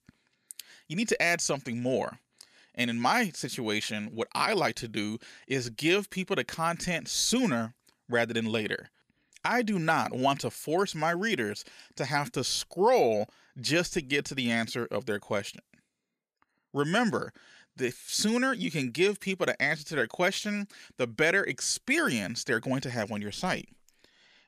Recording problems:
none

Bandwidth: 14 kHz